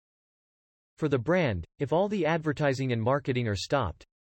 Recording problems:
none

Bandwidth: 16 kHz